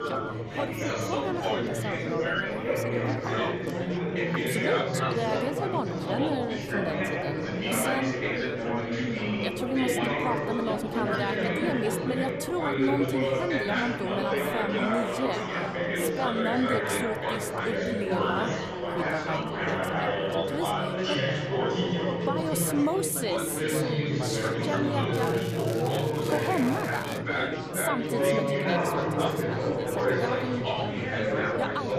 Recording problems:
chatter from many people; very loud; throughout; 4 dB above the speech
crackling; noticeable; from 25 to 27 s; 10 dB below the speech

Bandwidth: 14.5 kHz